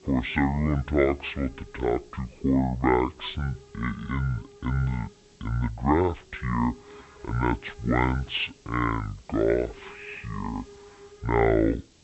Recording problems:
high frequencies cut off; severe; nothing above 4 kHz
wrong speed and pitch; too slow and too low; 0.6 times normal speed
hiss; faint; throughout; 25 dB below the speech

